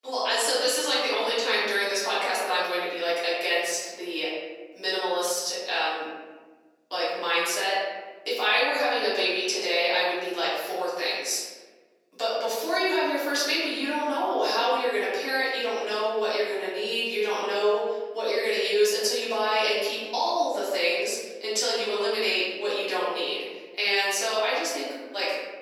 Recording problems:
off-mic speech; far
room echo; noticeable; dies away in 1.3 s
thin; somewhat; fading below 400 Hz

